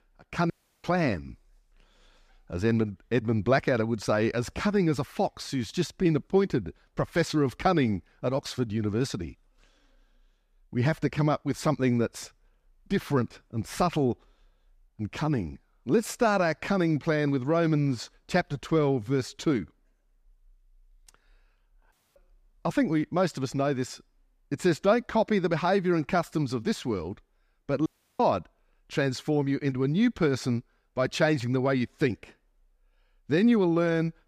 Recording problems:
audio cutting out; at 0.5 s, at 22 s and at 28 s

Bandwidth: 15 kHz